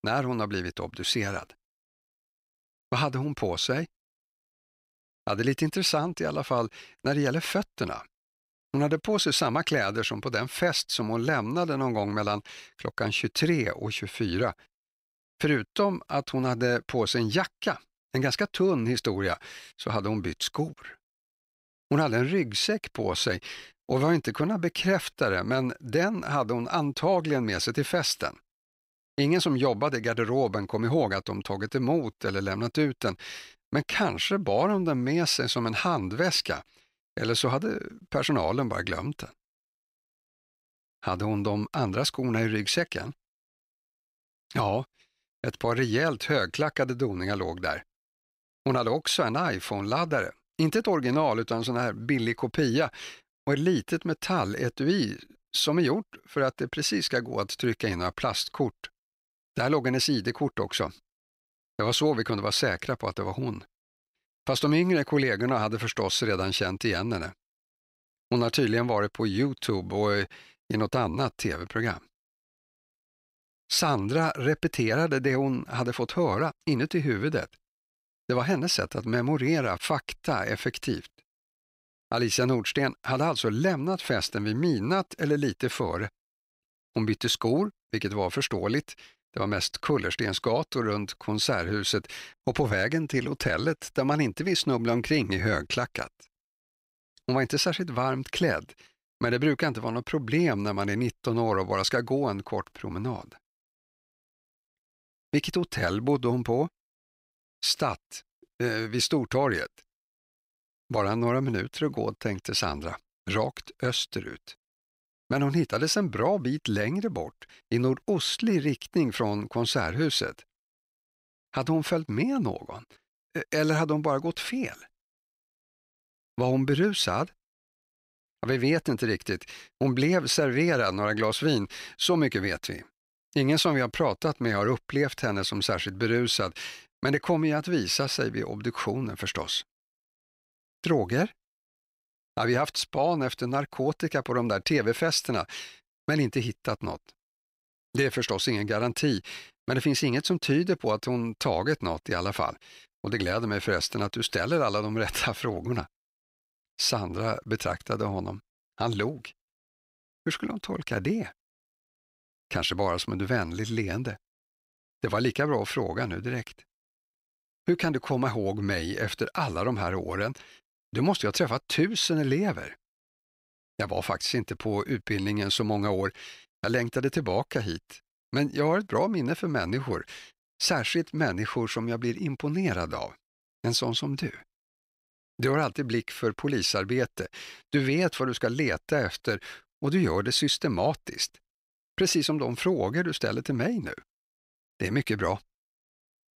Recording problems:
none

